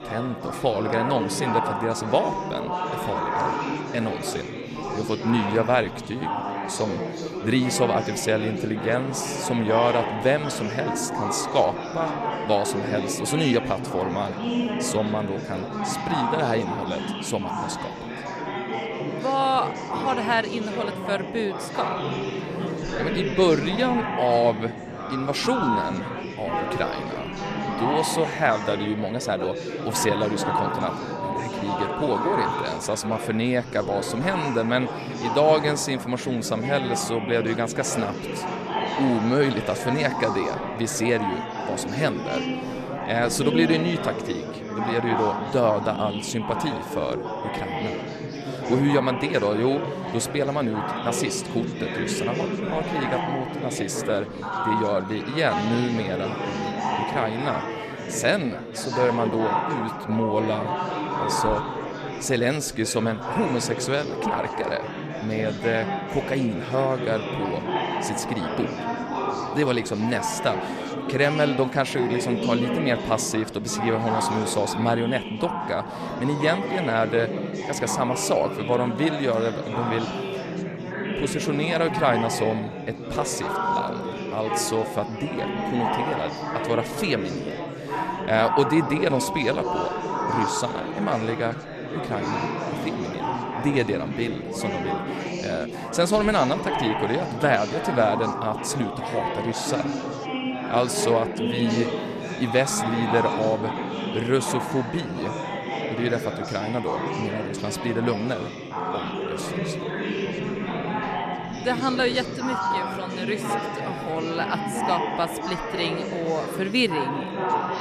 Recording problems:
chatter from many people; loud; throughout; 3 dB below the speech

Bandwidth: 13.5 kHz